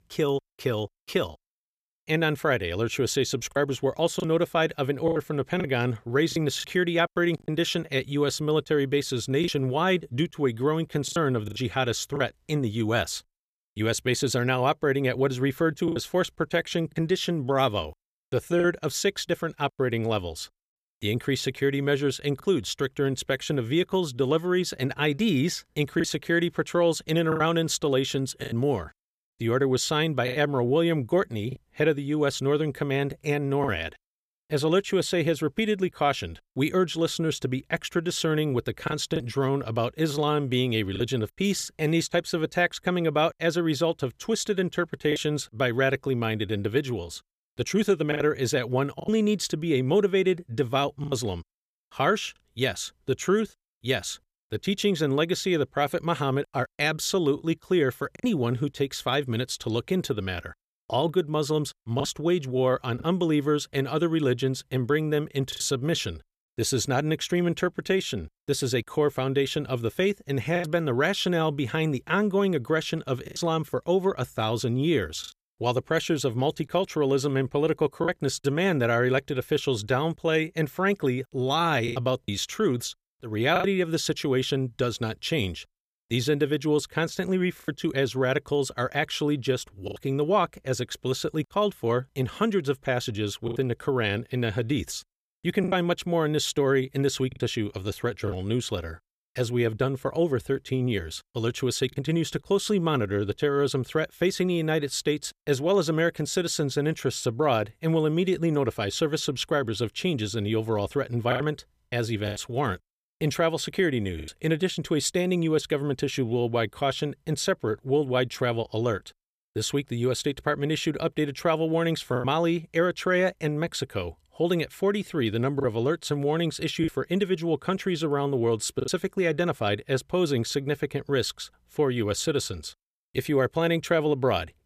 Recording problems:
choppy; occasionally; 3% of the speech affected

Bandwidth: 14.5 kHz